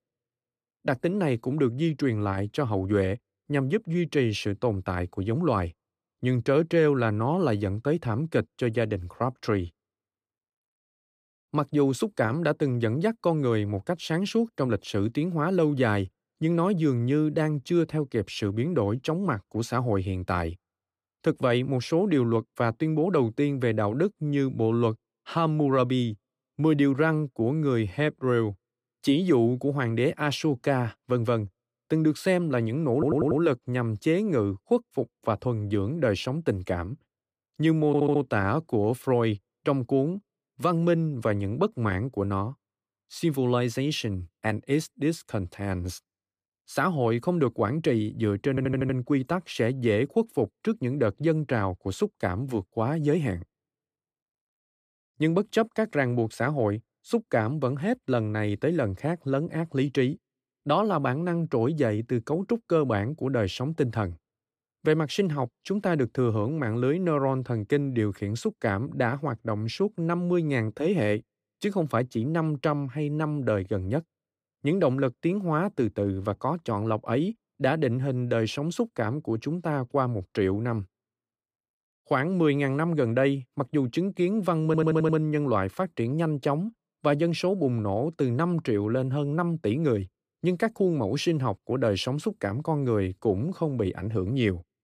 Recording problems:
audio stuttering; 4 times, first at 33 s

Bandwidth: 15 kHz